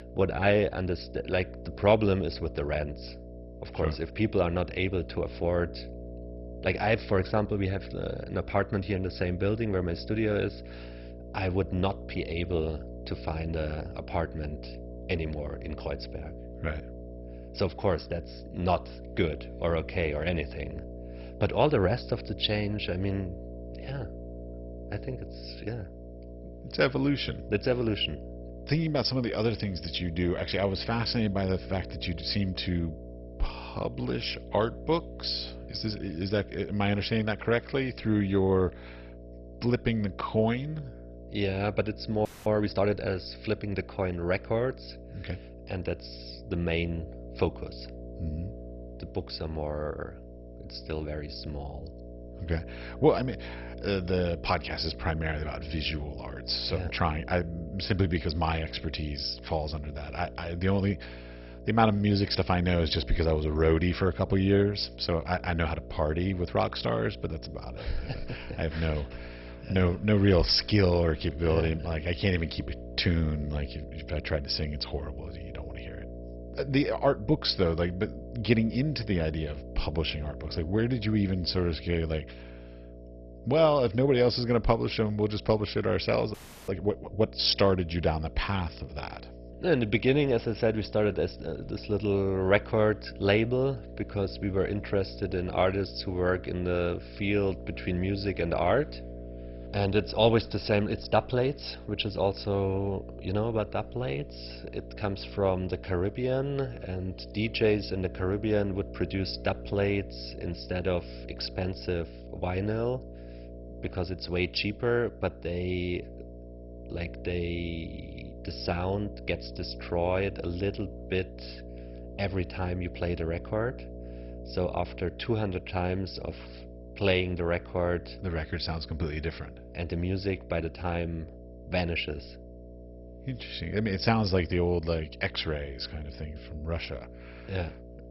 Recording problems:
garbled, watery; badly; nothing above 5.5 kHz
electrical hum; noticeable; throughout; 60 Hz, 15 dB below the speech
audio freezing; at 42 s and at 1:26

